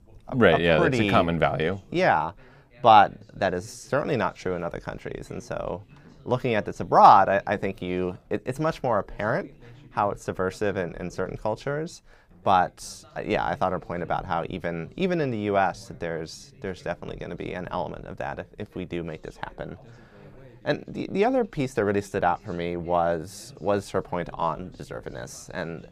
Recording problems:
background chatter; faint; throughout; 2 voices, 25 dB below the speech

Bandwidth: 15 kHz